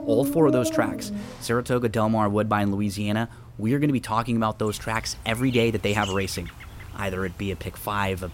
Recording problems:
animal sounds; loud; throughout; 8 dB below the speech

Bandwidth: 16 kHz